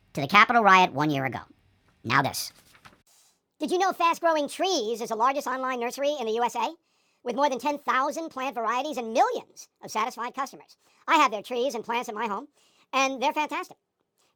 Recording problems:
wrong speed and pitch; too fast and too high; 1.5 times normal speed

